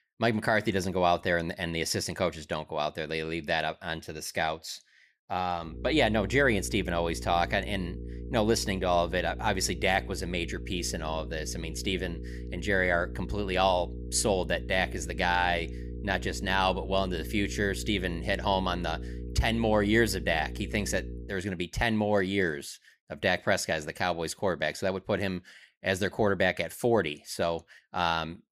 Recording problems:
electrical hum; noticeable; from 5.5 to 21 s; 60 Hz, 20 dB below the speech

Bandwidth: 15 kHz